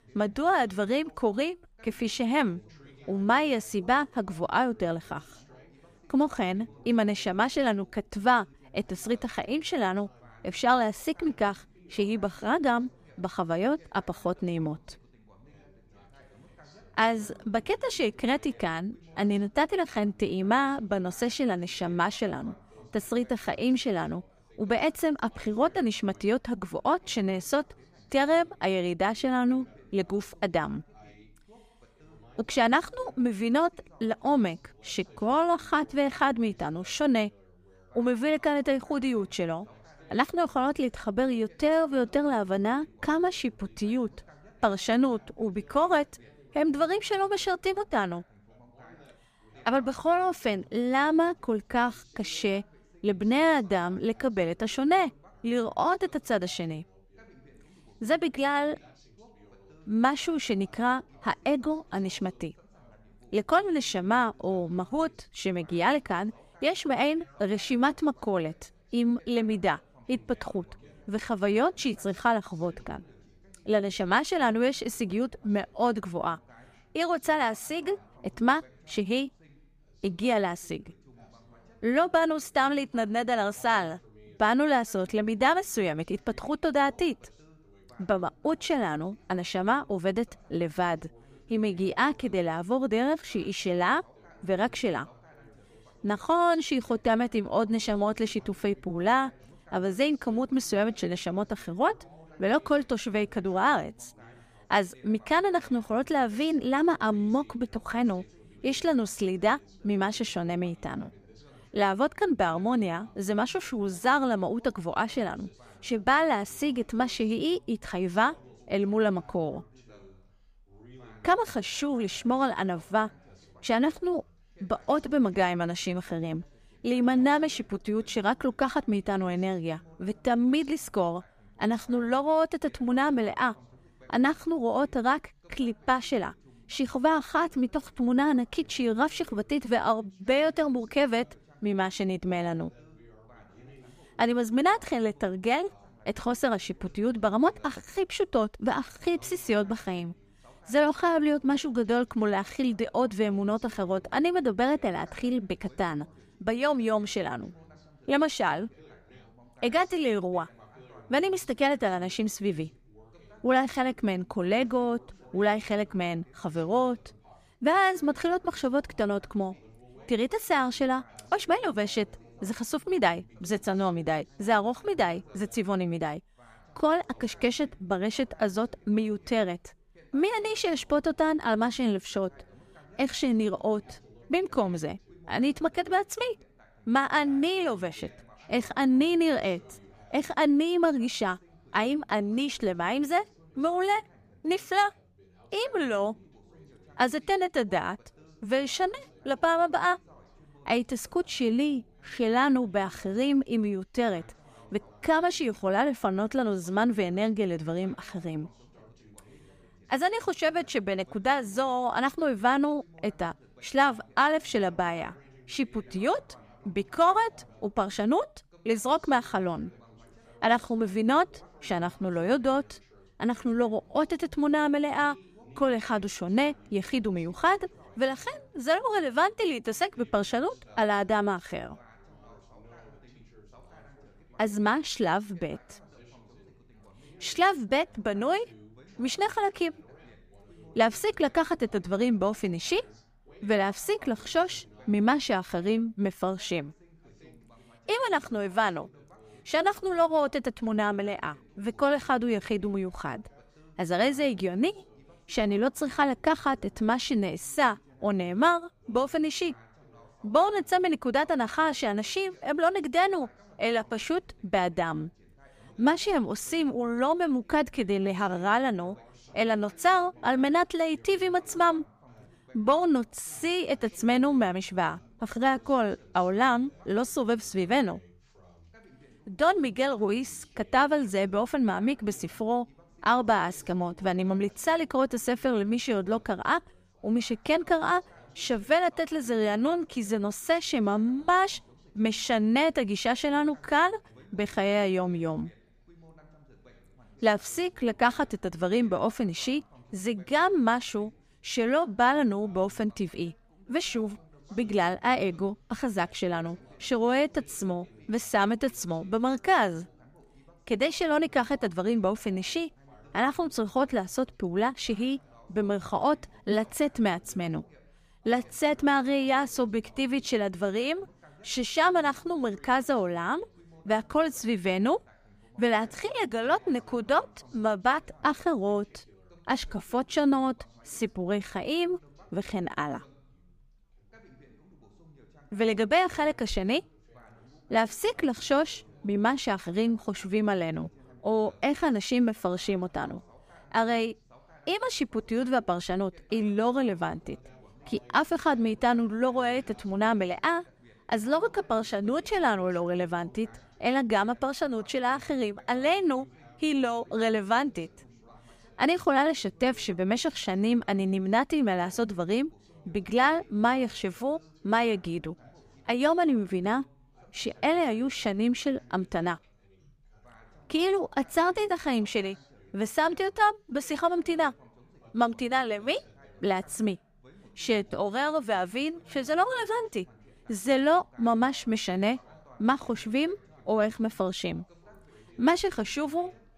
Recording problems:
background chatter; faint; throughout; 2 voices, 30 dB below the speech

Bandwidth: 15 kHz